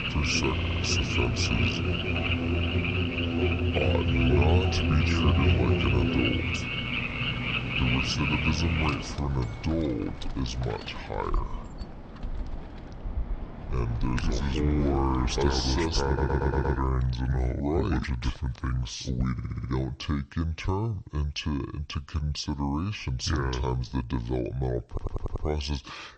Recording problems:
wrong speed and pitch; too slow and too low; 0.6 times normal speed
background music; very loud; until 12 s; as loud as the speech
animal sounds; loud; until 17 s; 2 dB below the speech
audio stuttering; 4 times, first at 0.5 s

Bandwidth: 8.5 kHz